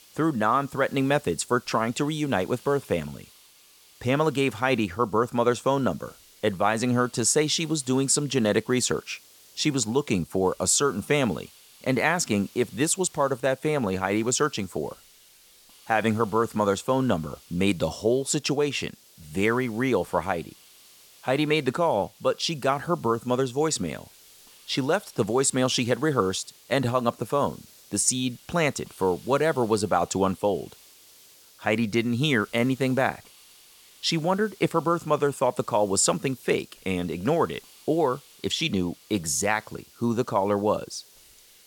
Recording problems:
hiss; faint; throughout; 25 dB below the speech

